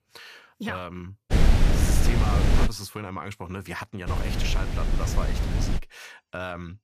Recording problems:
wind noise on the microphone; heavy; from 1.5 to 2.5 s and from 4 to 6 s; 2 dB above the speech

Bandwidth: 14.5 kHz